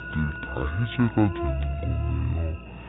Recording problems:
high frequencies cut off; severe; nothing above 4 kHz
wrong speed and pitch; too slow and too low; 0.5 times normal speed
muffled; very slightly; fading above 4 kHz
electrical hum; loud; throughout; 60 Hz, 5 dB below the speech
alarms or sirens; noticeable; throughout; 10 dB below the speech

